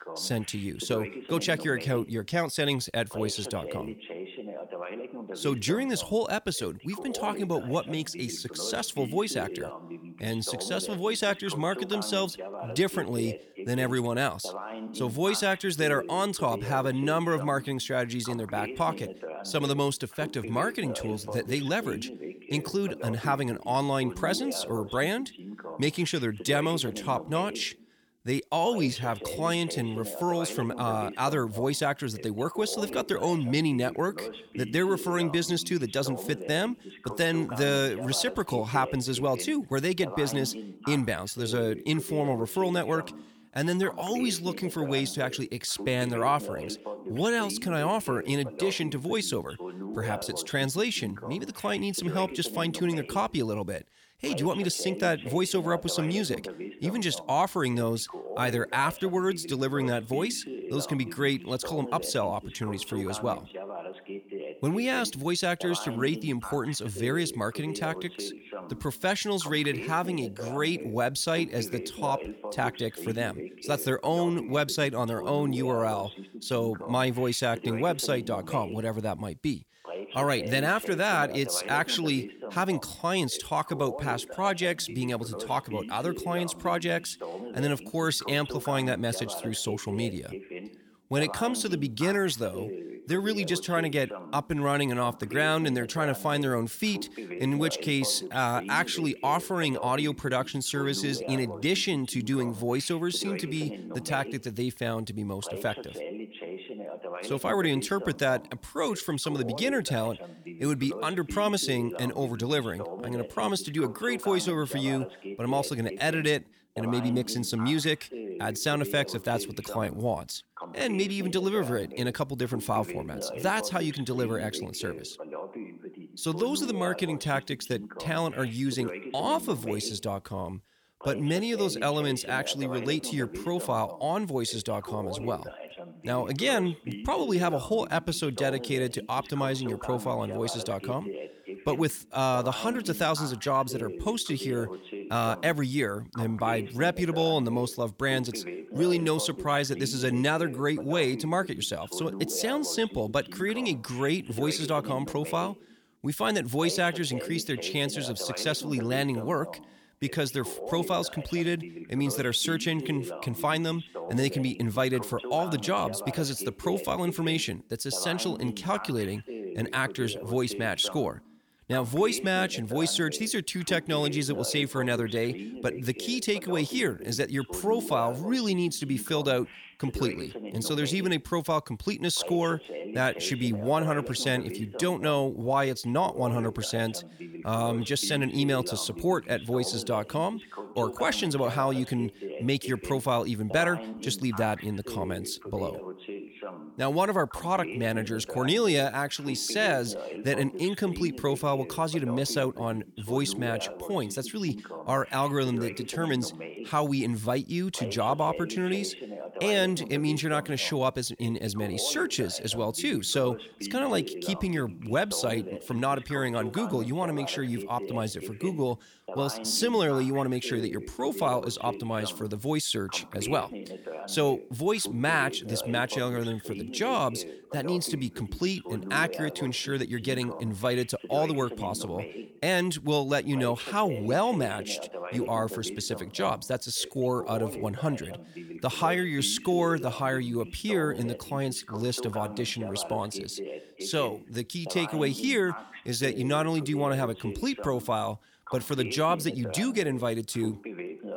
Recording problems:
voice in the background; noticeable; throughout; 10 dB below the speech

